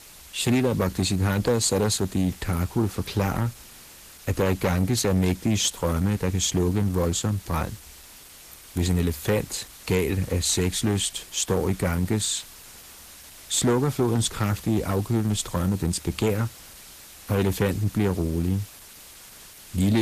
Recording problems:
distortion; slight; 10 dB below the speech
garbled, watery; slightly; nothing above 14.5 kHz
hiss; noticeable; throughout; 20 dB below the speech
abrupt cut into speech; at the end

